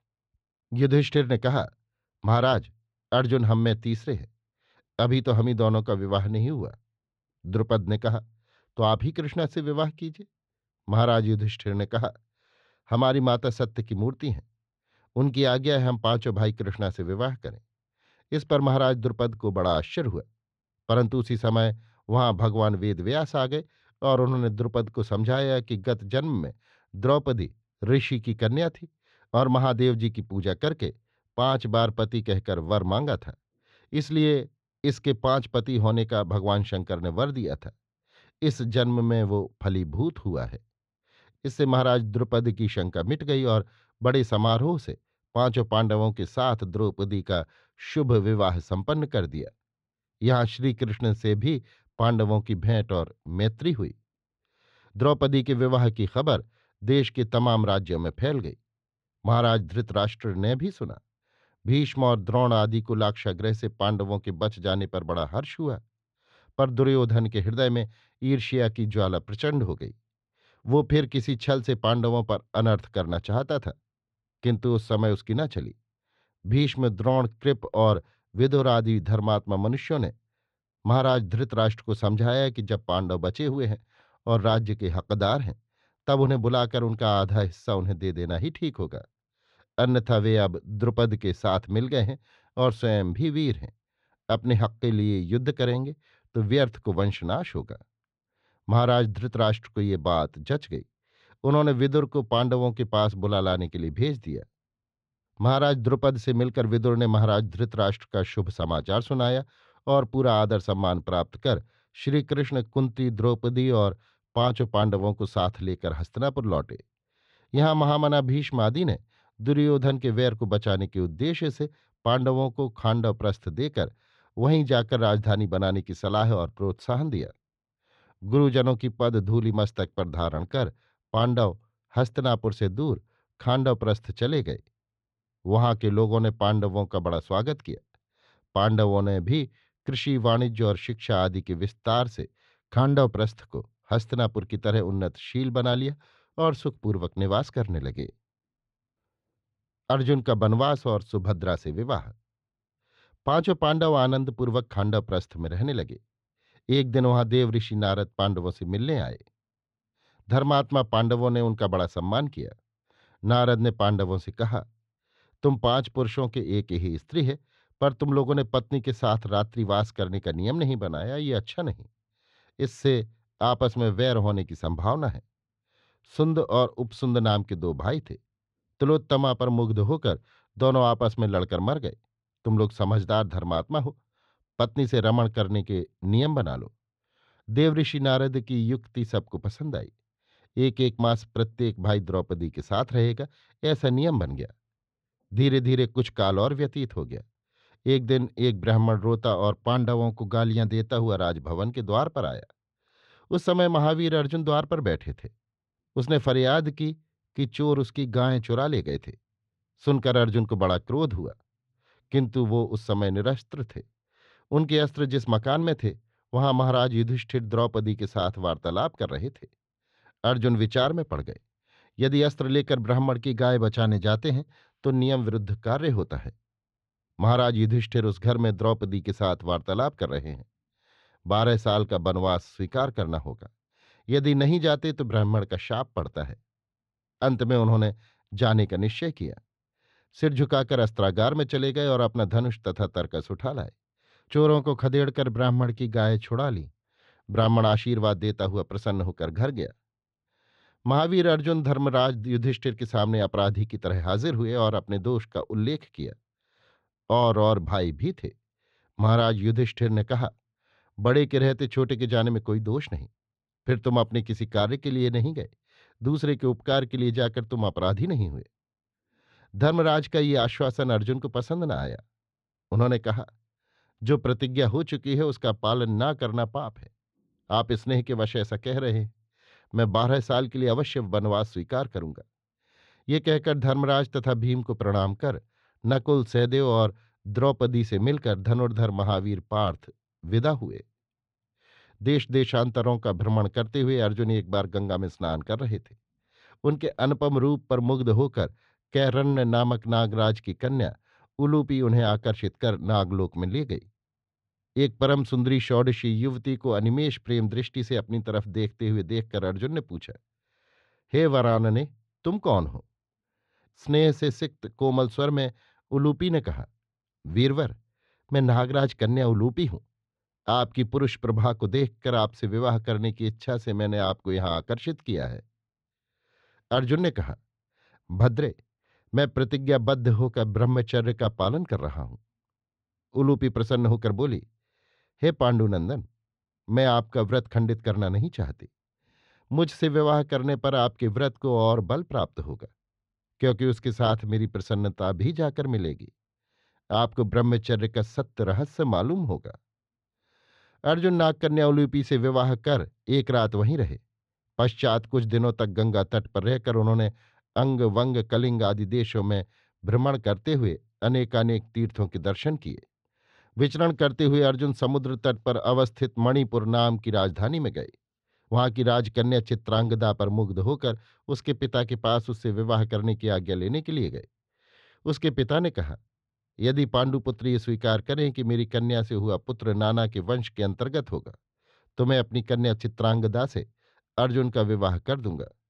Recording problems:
muffled; very slightly; fading above 4 kHz

